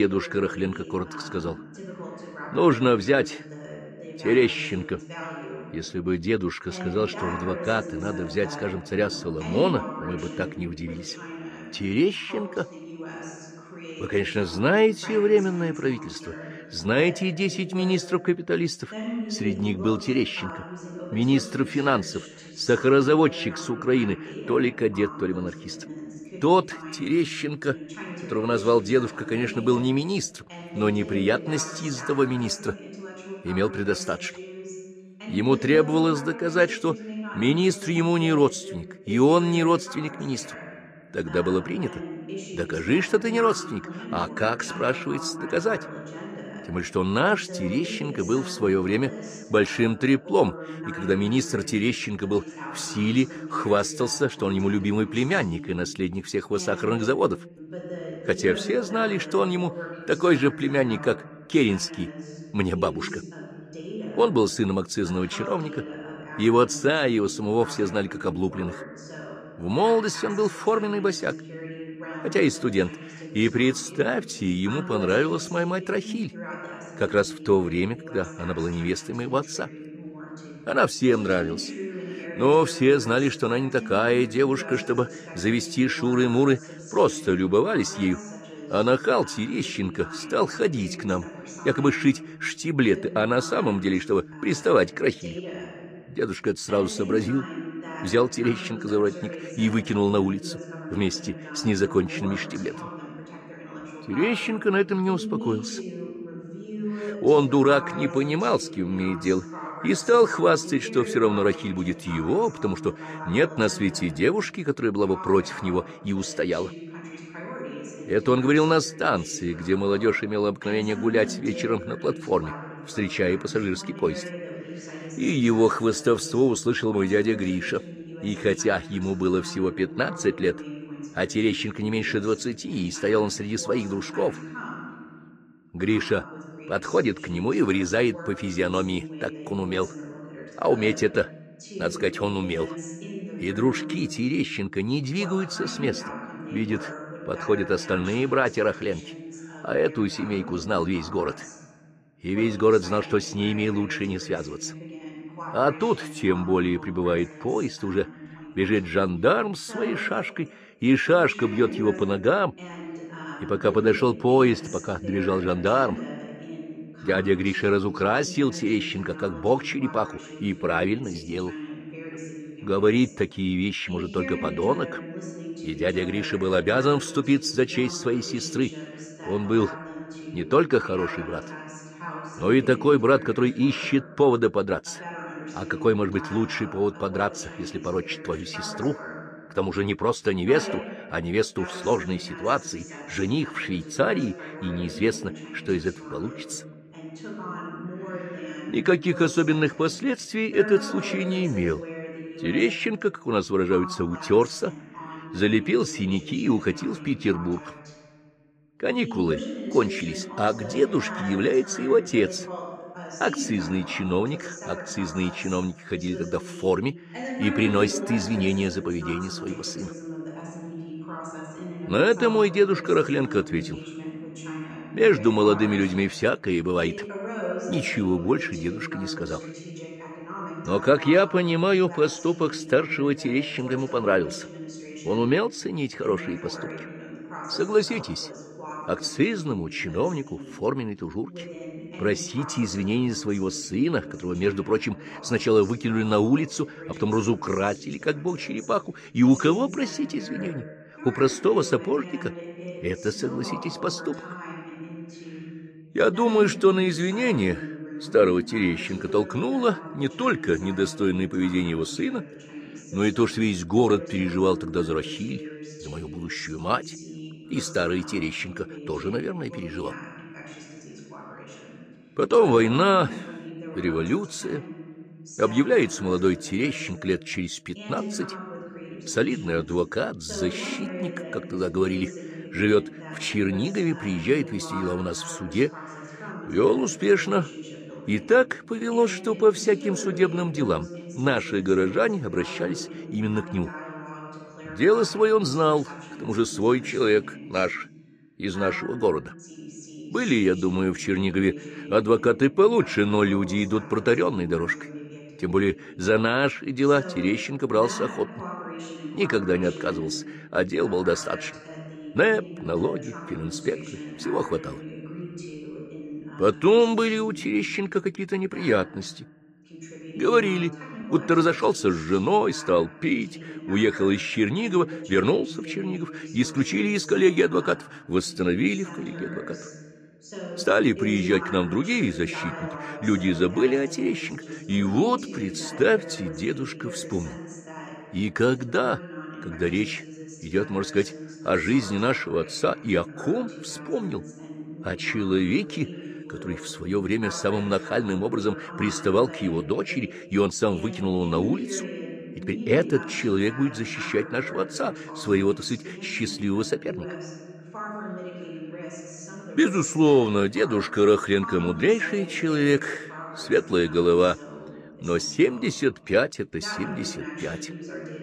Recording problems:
voice in the background; noticeable; throughout; 15 dB below the speech
abrupt cut into speech; at the start

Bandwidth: 14.5 kHz